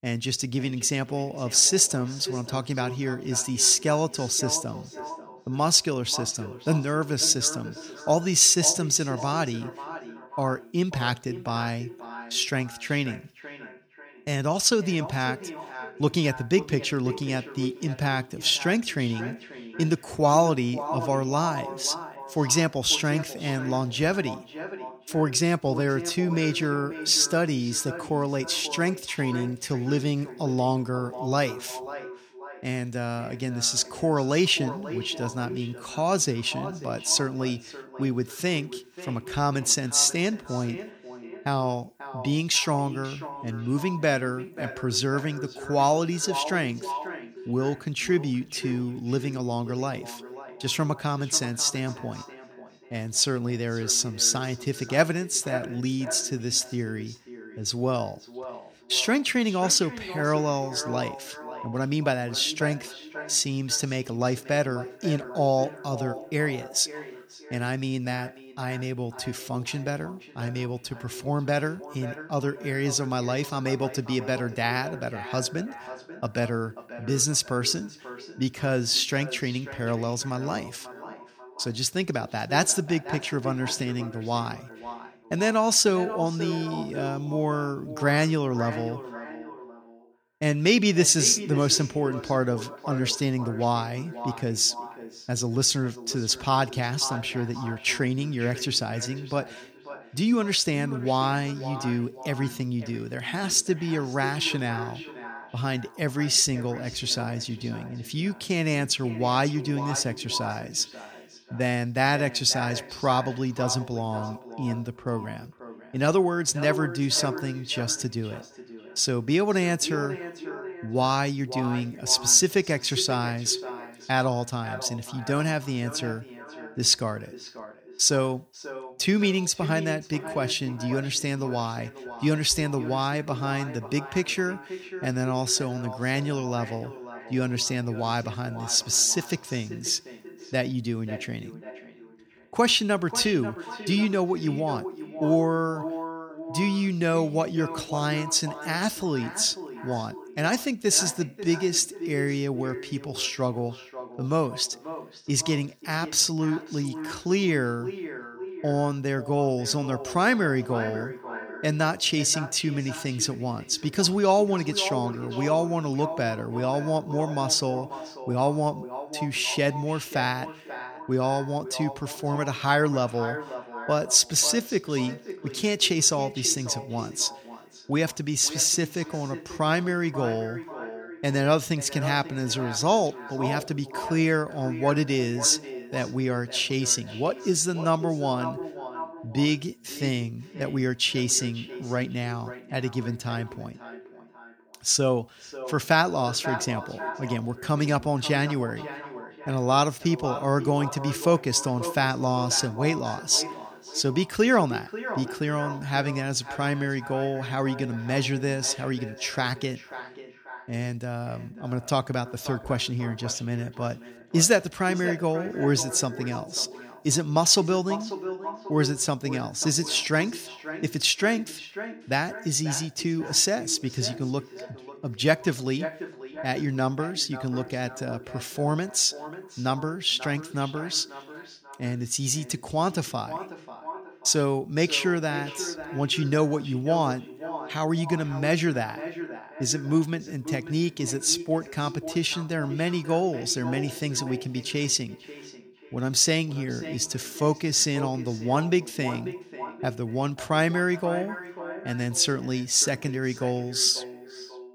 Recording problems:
echo of what is said; noticeable; throughout; 540 ms later, 15 dB below the speech

